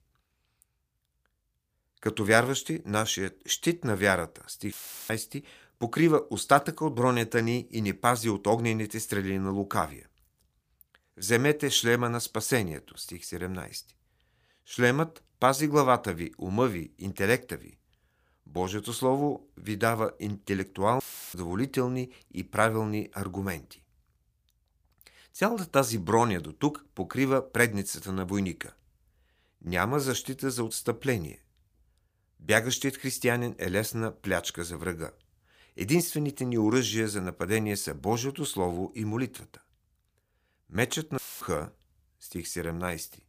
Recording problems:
audio cutting out; filled with static; at 4.5 s, at 21 s and at 41 s

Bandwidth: 15 kHz